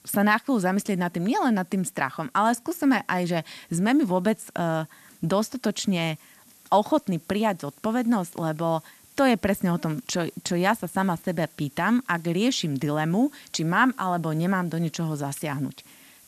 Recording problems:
hiss; faint; throughout; 25 dB below the speech

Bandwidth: 13.5 kHz